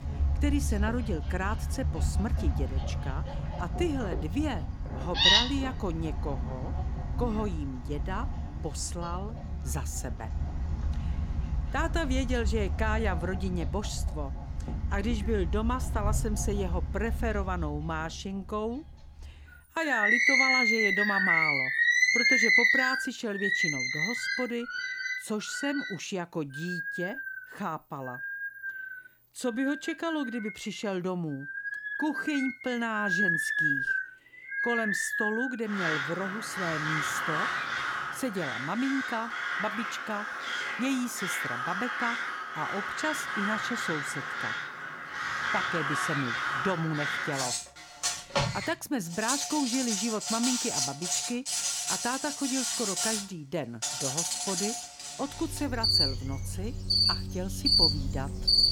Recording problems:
animal sounds; very loud; throughout; 5 dB above the speech

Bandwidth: 17.5 kHz